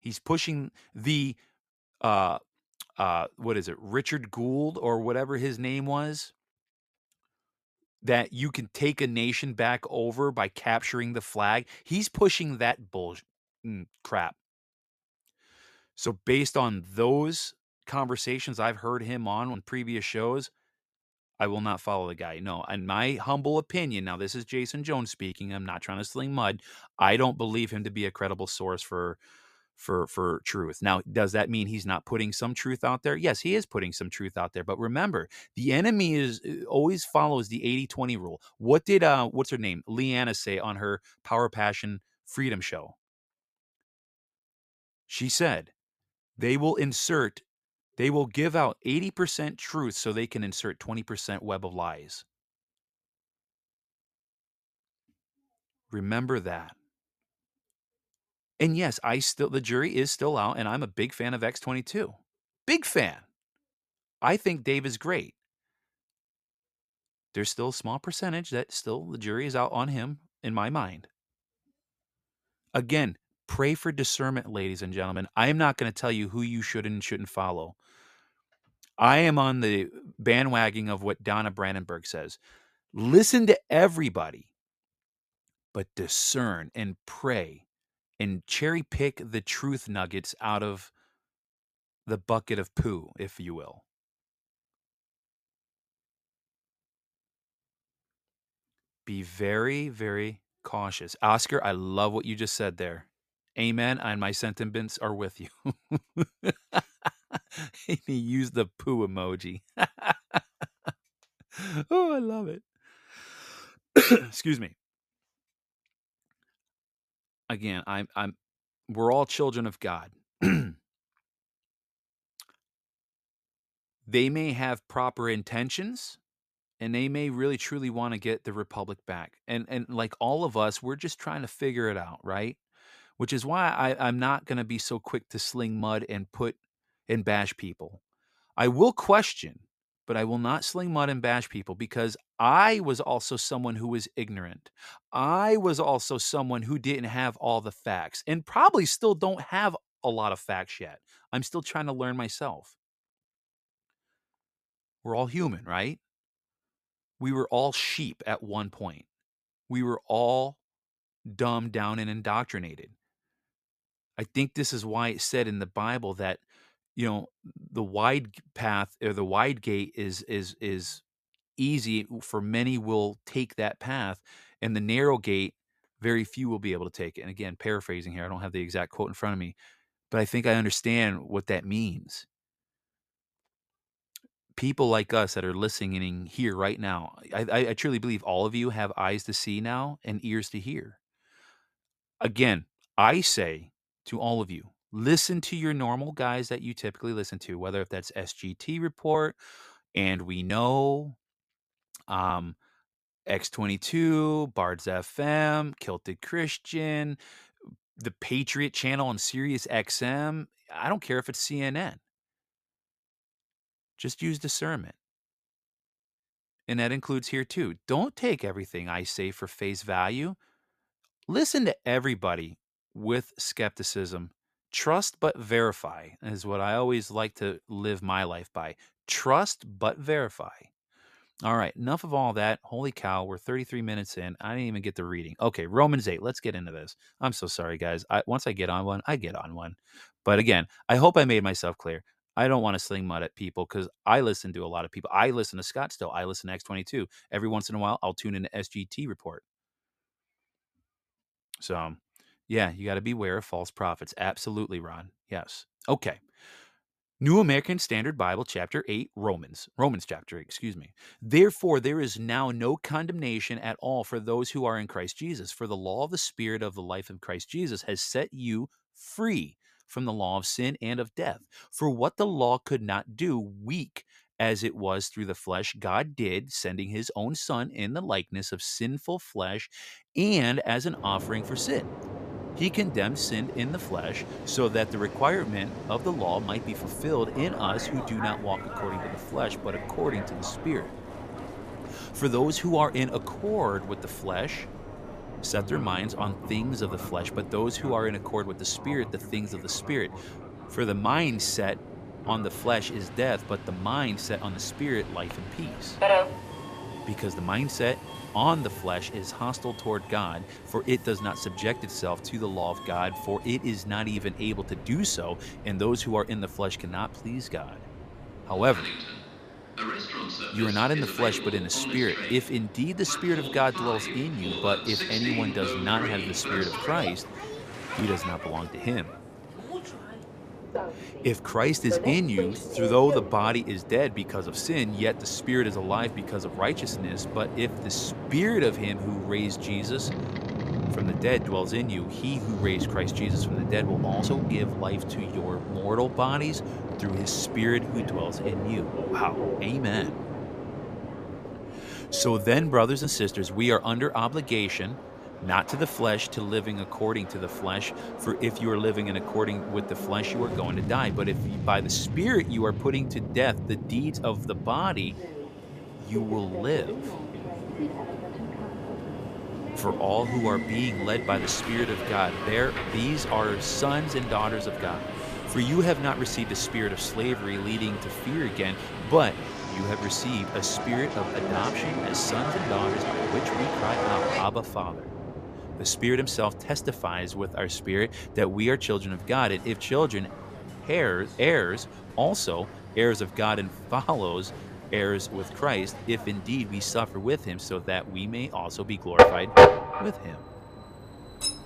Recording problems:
train or aircraft noise; loud; from 4:41 on; 4 dB below the speech

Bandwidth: 14.5 kHz